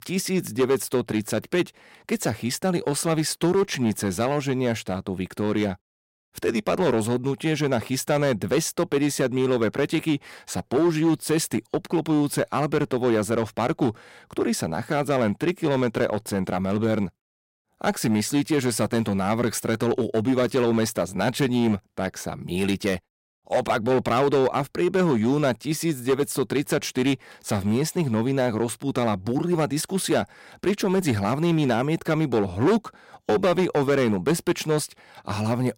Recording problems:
distortion; slight; 6% of the sound clipped

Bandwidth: 16 kHz